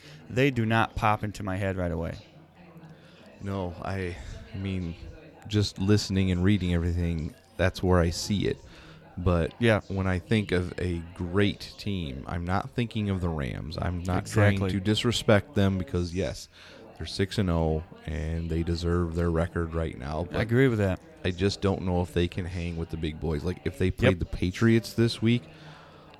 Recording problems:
background chatter; faint; throughout; 4 voices, 25 dB below the speech

